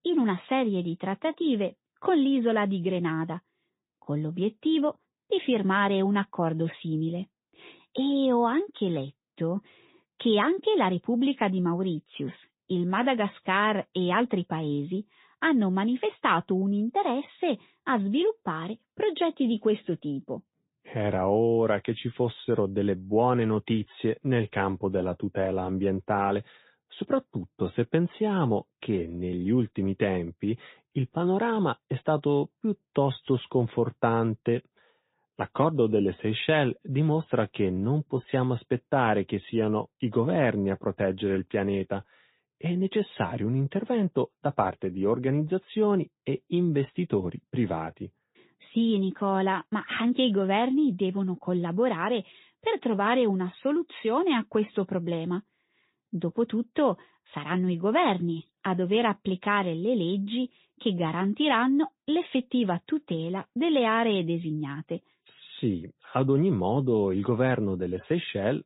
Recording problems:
high frequencies cut off; severe; nothing above 4 kHz
garbled, watery; slightly

